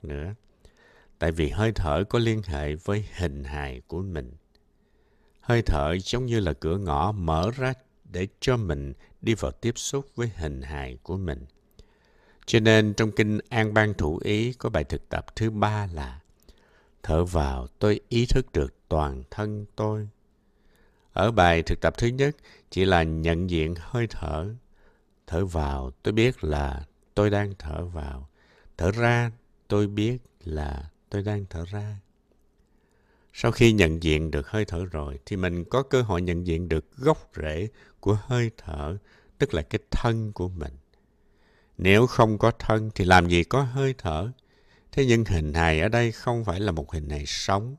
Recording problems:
none

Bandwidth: 14.5 kHz